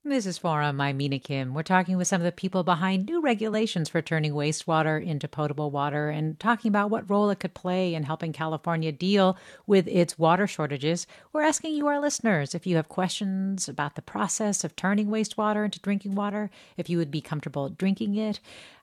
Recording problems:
none

